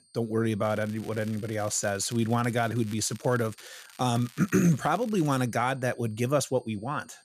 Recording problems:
high-pitched whine; faint; throughout; 8.5 kHz, 35 dB below the speech
crackling; faint; from 0.5 to 3.5 s and from 3.5 to 5.5 s; 20 dB below the speech

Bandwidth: 14.5 kHz